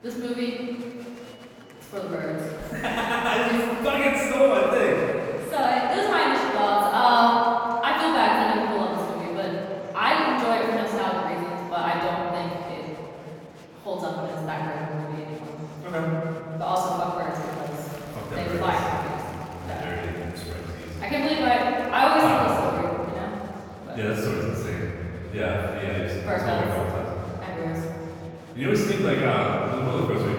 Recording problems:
room echo; strong; dies away in 2.7 s
off-mic speech; far
murmuring crowd; faint; throughout; 20 dB below the speech

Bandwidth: 18.5 kHz